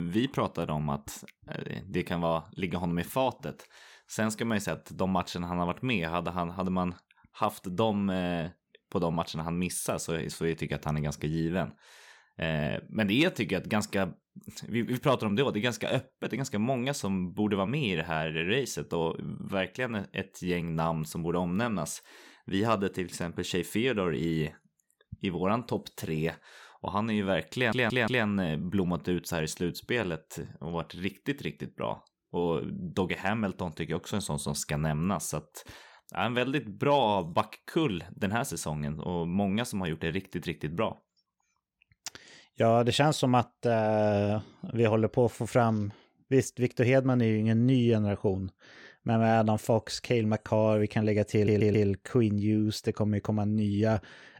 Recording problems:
abrupt cut into speech; at the start
audio stuttering; at 28 s and at 51 s

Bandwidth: 17.5 kHz